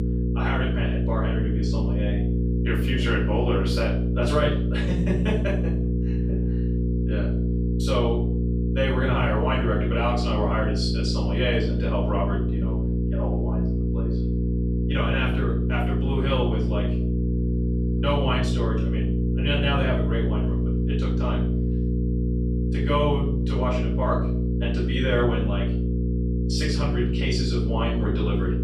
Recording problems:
off-mic speech; far
room echo; noticeable; dies away in 0.6 s
electrical hum; loud; throughout; 60 Hz, 5 dB below the speech

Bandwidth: 15 kHz